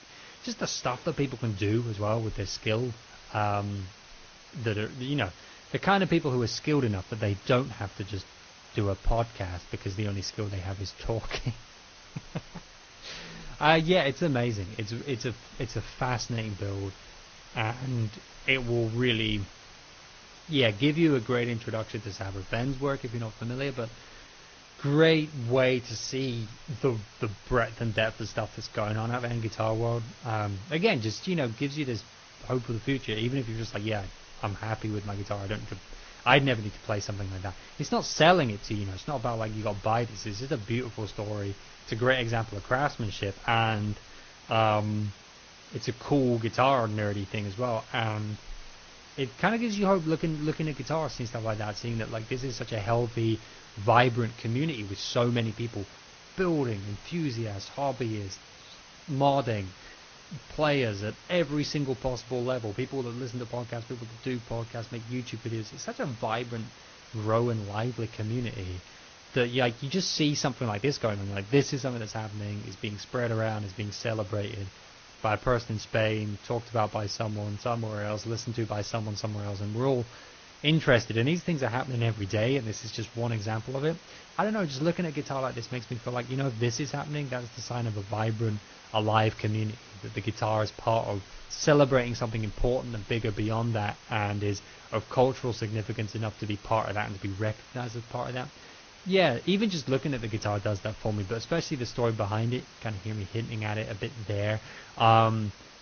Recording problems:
garbled, watery; slightly; nothing above 6.5 kHz
hiss; noticeable; throughout; 20 dB below the speech

